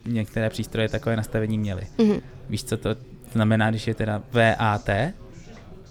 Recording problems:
background chatter; faint; throughout; 3 voices, 20 dB below the speech

